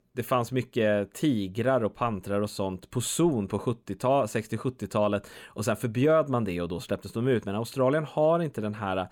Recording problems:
none

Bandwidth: 17.5 kHz